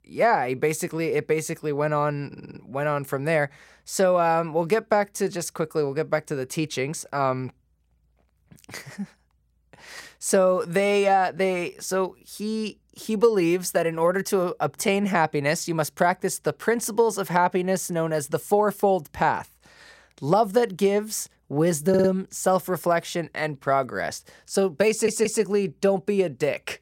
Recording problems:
audio stuttering; at 2.5 s, at 22 s and at 25 s

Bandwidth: 16 kHz